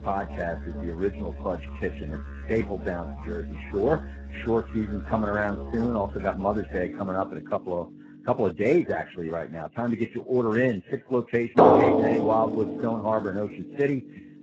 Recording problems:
garbled, watery; badly; nothing above 7.5 kHz
background music; loud; throughout; 1 dB below the speech

